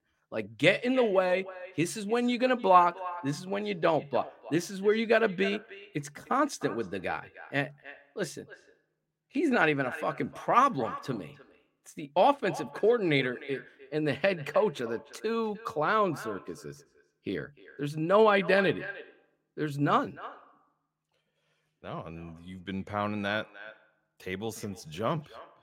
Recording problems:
echo of what is said; noticeable; throughout; 300 ms later, 15 dB below the speech

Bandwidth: 16 kHz